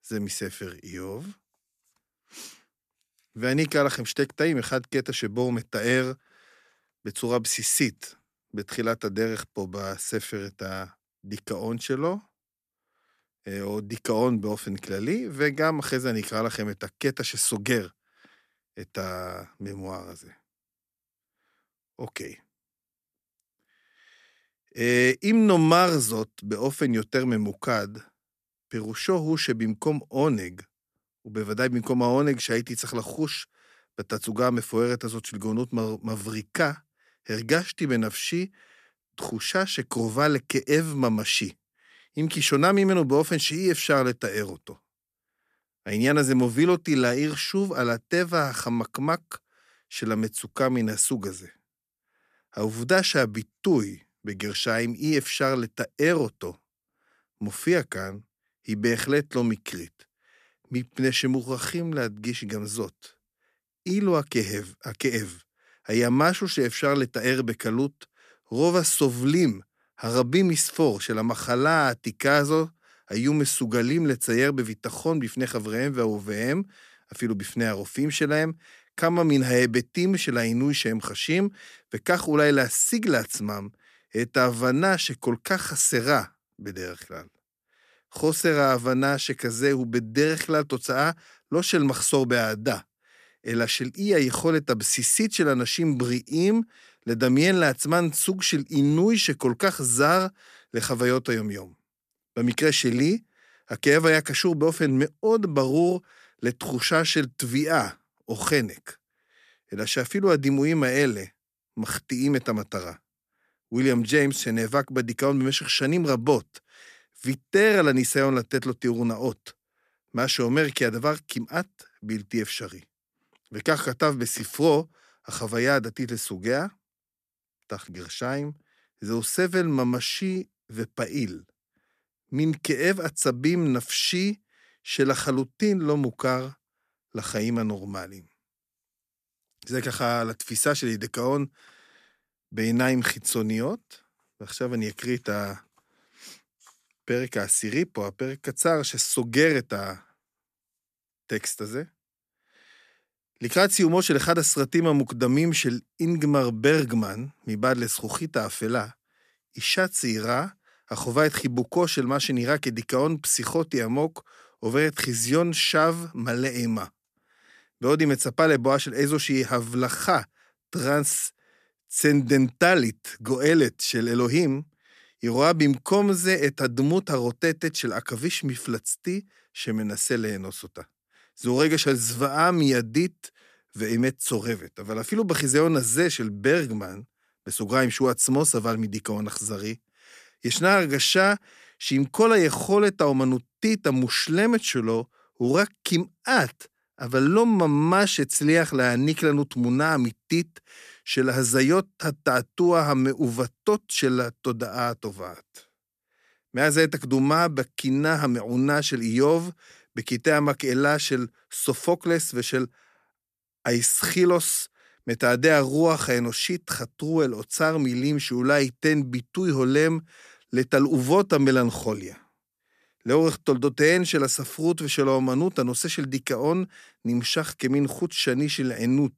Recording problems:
none

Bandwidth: 14.5 kHz